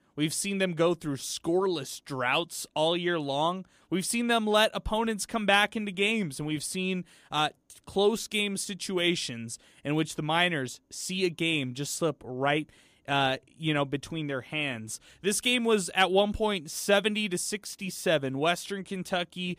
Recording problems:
none

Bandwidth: 15 kHz